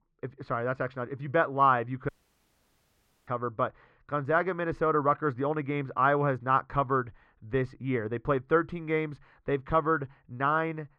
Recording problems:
muffled; very; fading above 1.5 kHz
audio cutting out; at 2 s for 1 s

